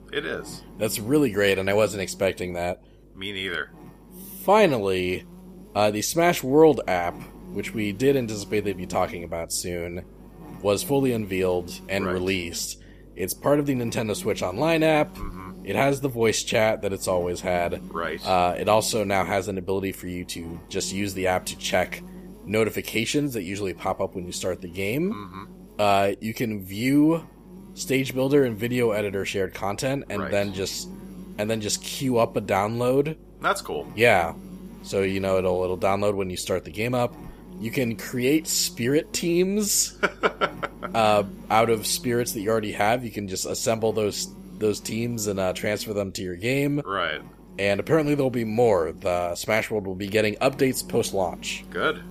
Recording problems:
electrical hum; faint; throughout; 50 Hz, 25 dB below the speech

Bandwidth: 15 kHz